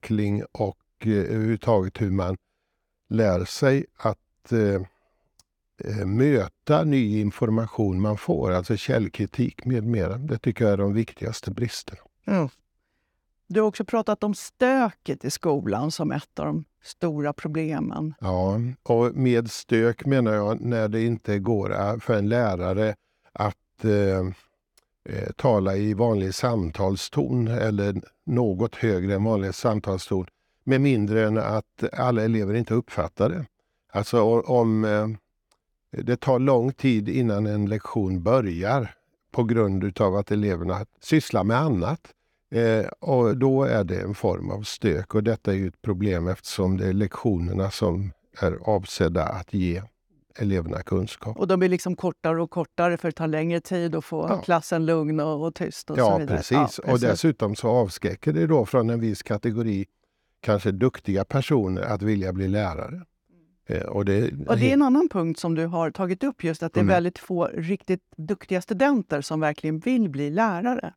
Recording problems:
none

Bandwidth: 18 kHz